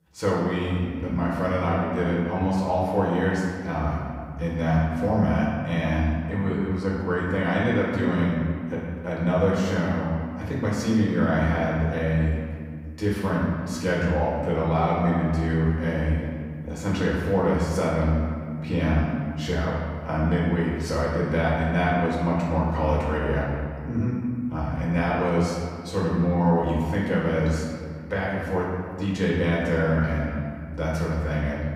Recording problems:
off-mic speech; far
room echo; noticeable; dies away in 1.9 s

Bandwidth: 15.5 kHz